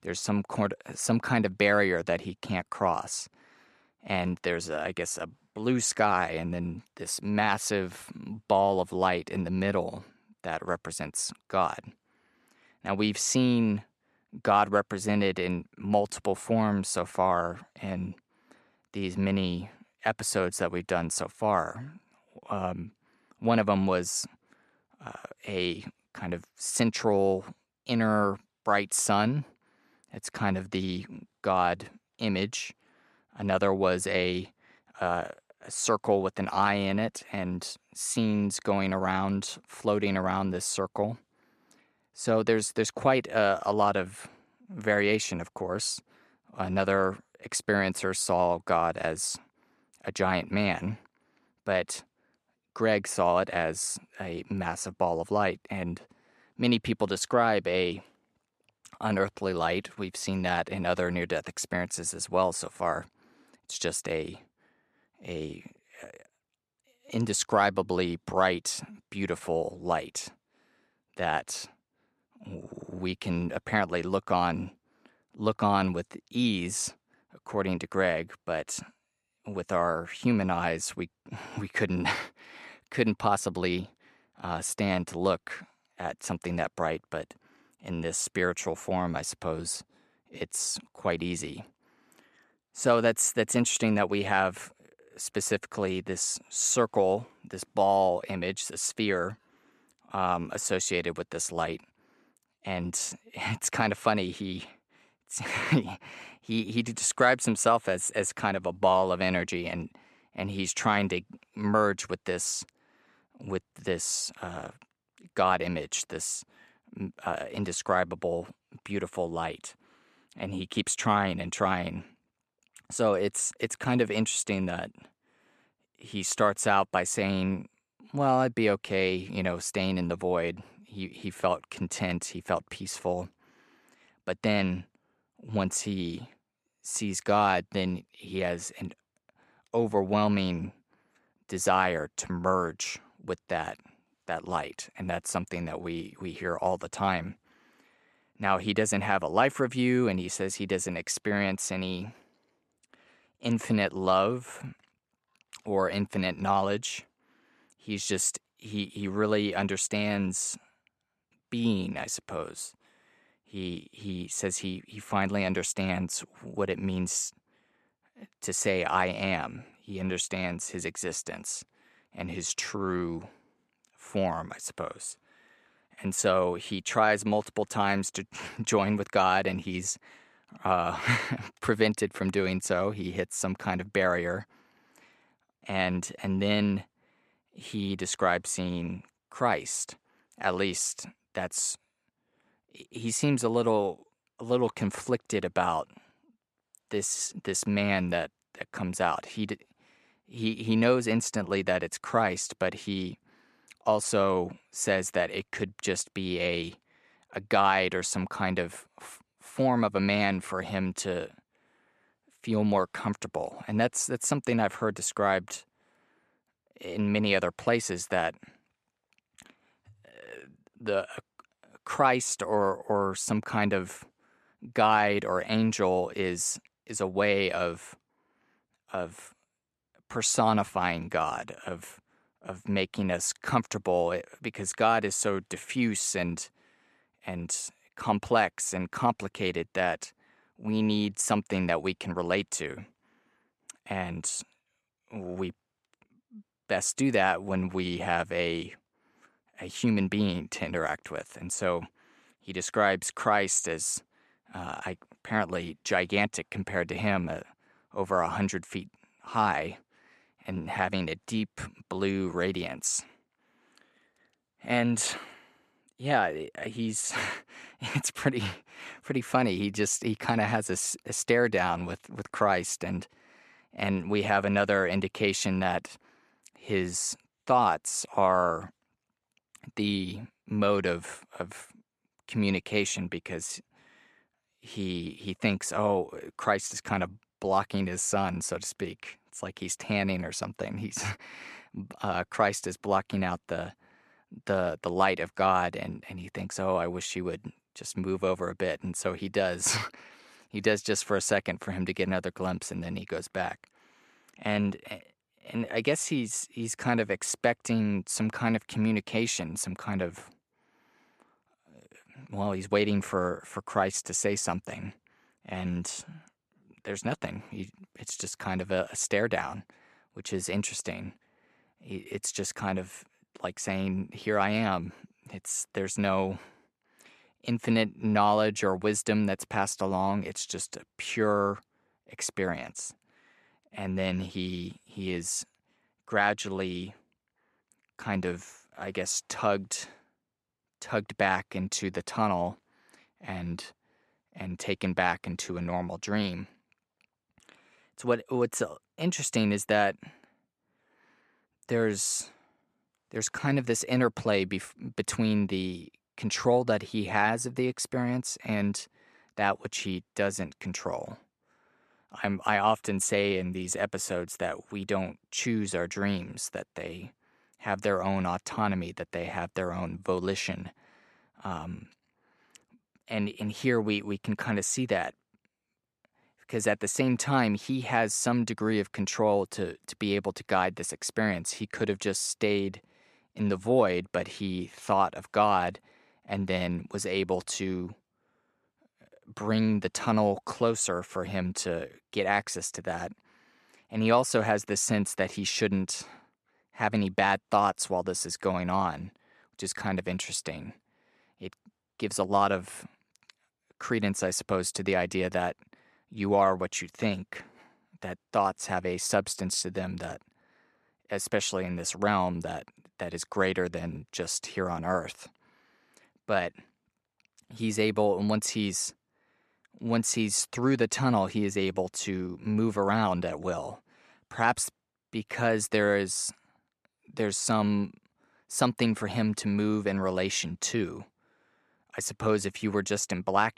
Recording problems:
none

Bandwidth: 13.5 kHz